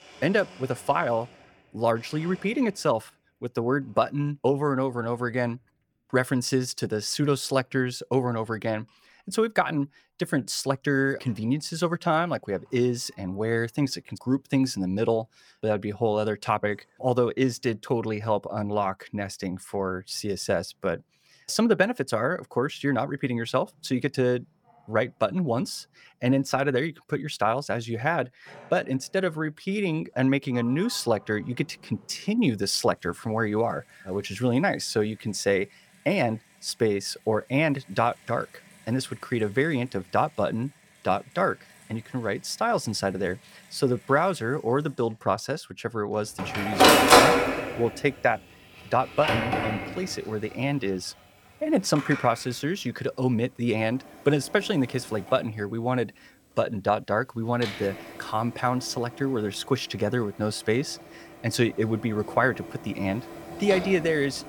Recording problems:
household noises; very loud; throughout; 2 dB above the speech

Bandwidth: 18.5 kHz